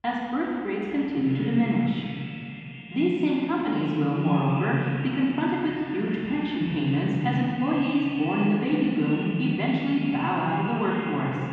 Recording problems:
room echo; strong; dies away in 2.4 s
off-mic speech; far
muffled; very; fading above 3 kHz
echo of what is said; noticeable; throughout; 390 ms later, 15 dB below the speech

